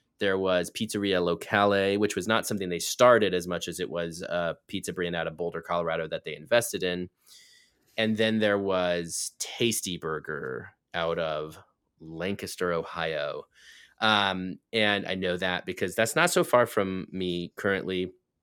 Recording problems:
none

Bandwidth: 18 kHz